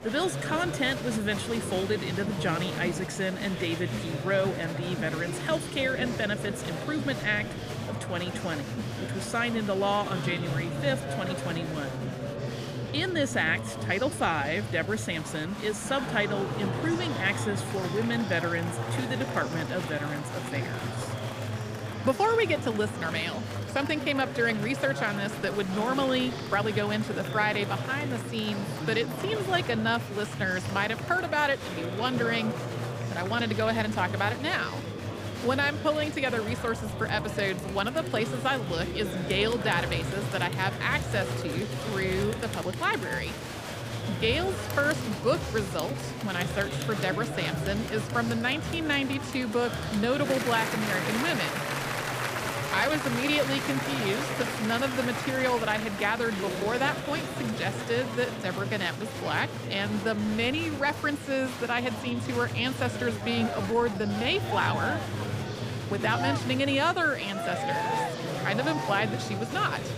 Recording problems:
murmuring crowd; loud; throughout; 4 dB below the speech
uneven, jittery; strongly; from 14 s to 1:04

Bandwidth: 15 kHz